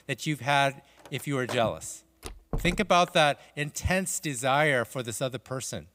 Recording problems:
household noises; noticeable; throughout; 20 dB below the speech
door banging; noticeable; at 2.5 s; peak 9 dB below the speech

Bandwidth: 15.5 kHz